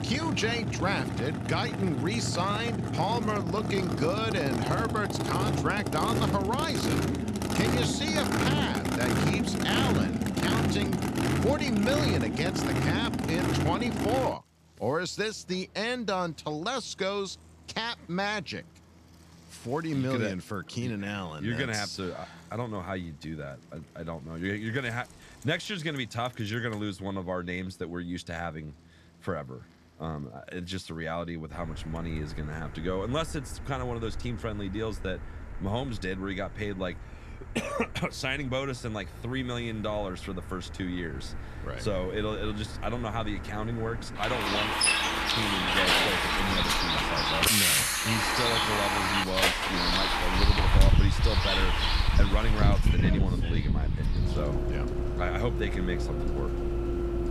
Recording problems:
traffic noise; very loud; throughout; 5 dB above the speech

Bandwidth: 14 kHz